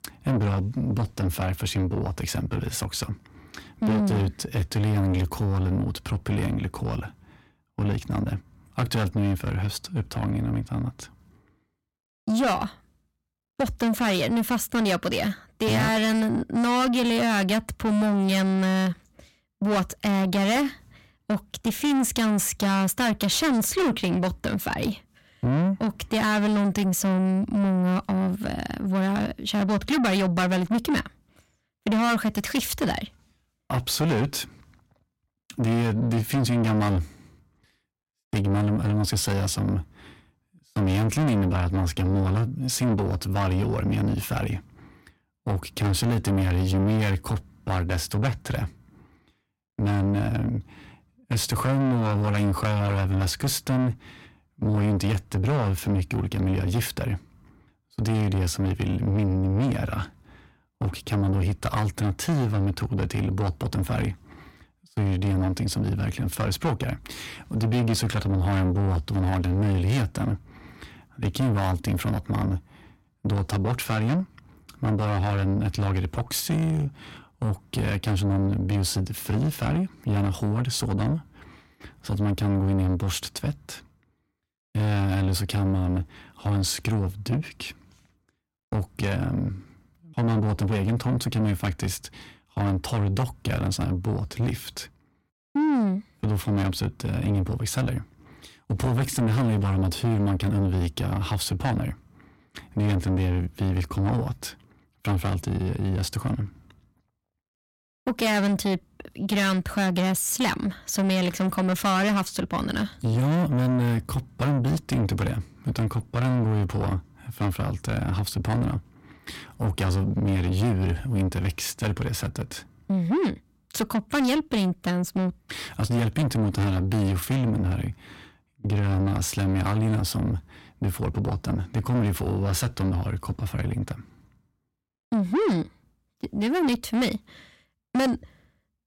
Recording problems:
distortion; heavy; 7 dB below the speech

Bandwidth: 16.5 kHz